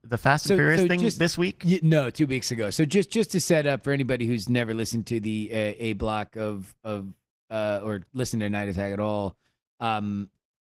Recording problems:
garbled, watery; slightly; nothing above 15.5 kHz

